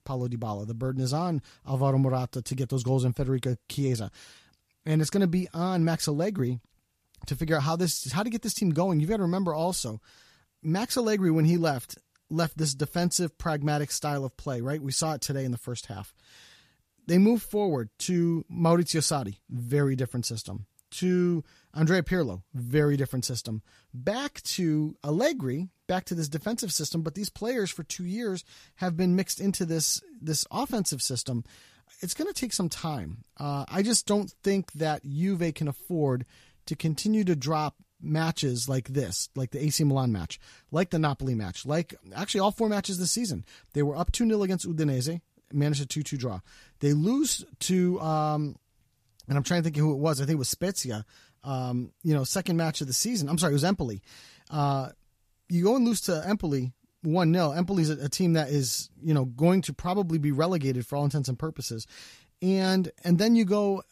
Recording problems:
none

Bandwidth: 14.5 kHz